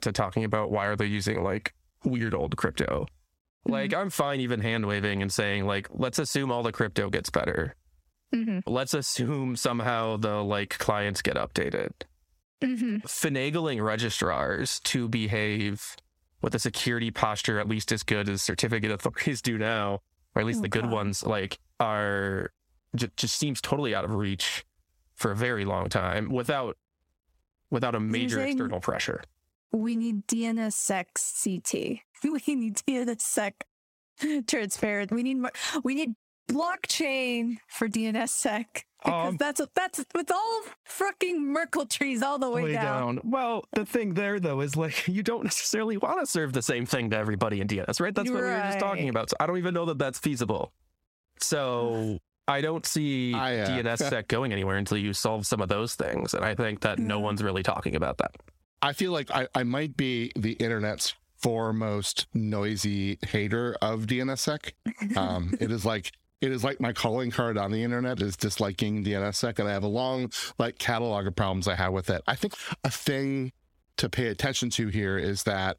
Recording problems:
squashed, flat; heavily

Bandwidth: 16.5 kHz